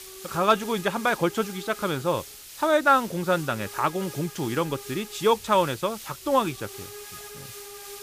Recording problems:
hiss; noticeable; throughout; 15 dB below the speech

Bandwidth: 15 kHz